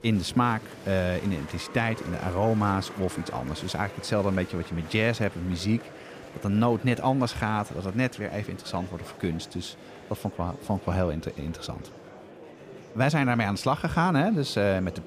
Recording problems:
murmuring crowd; noticeable; throughout; 15 dB below the speech

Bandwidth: 15 kHz